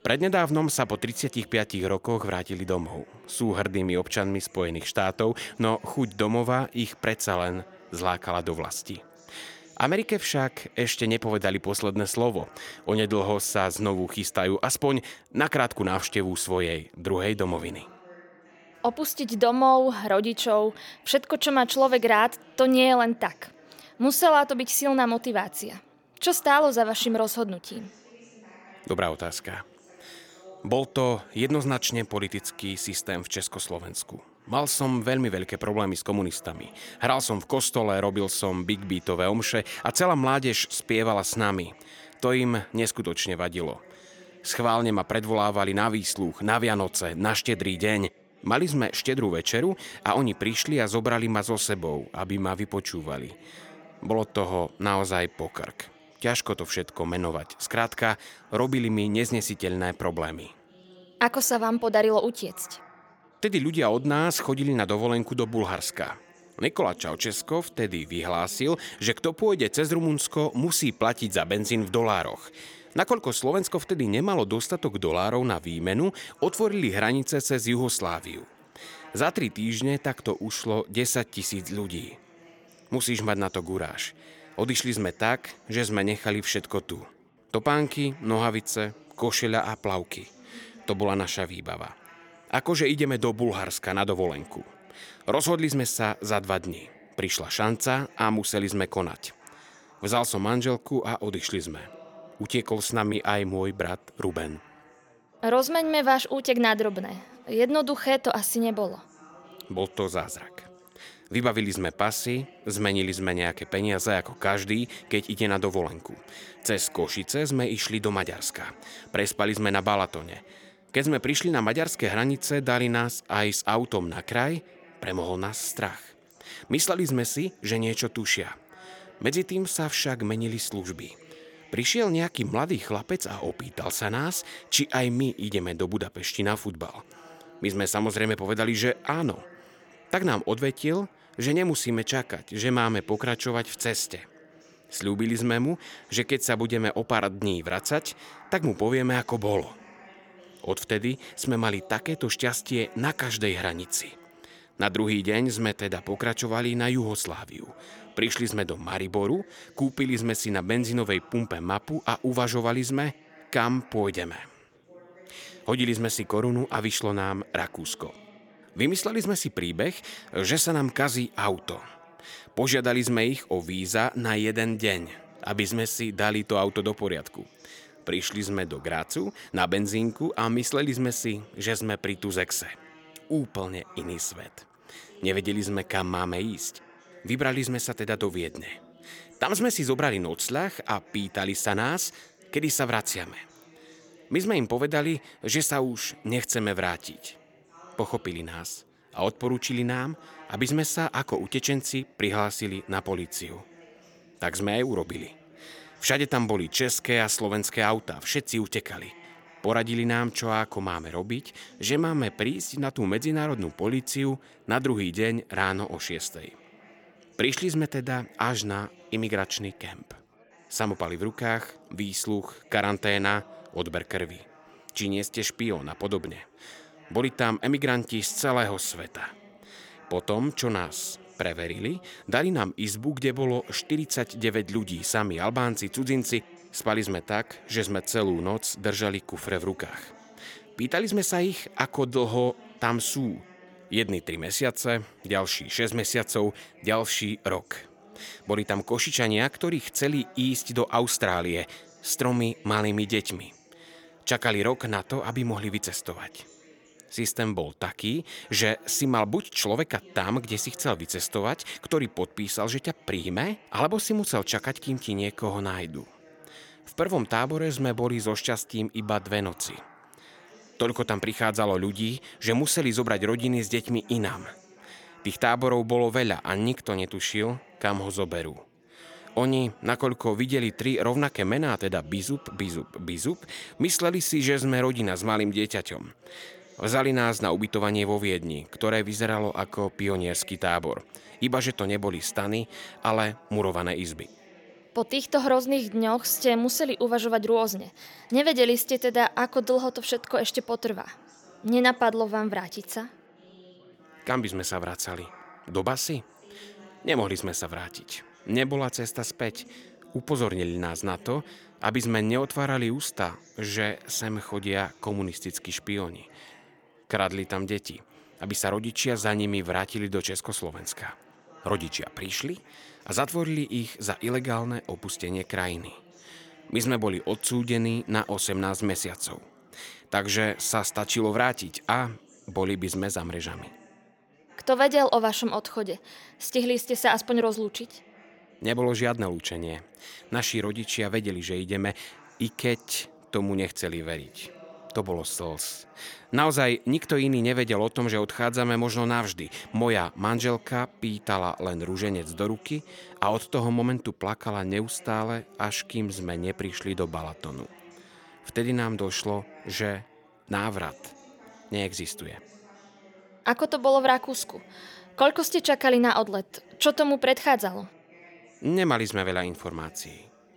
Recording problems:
chatter from many people; faint; throughout; 25 dB below the speech

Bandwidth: 17.5 kHz